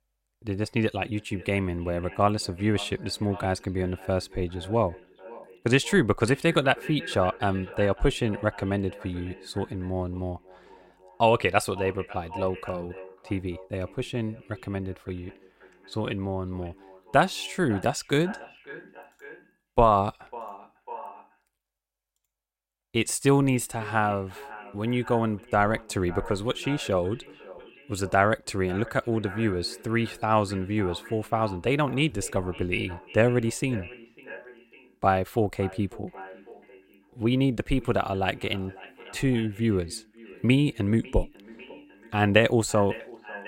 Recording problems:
echo of what is said; faint; throughout; 550 ms later, 20 dB below the speech

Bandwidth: 16 kHz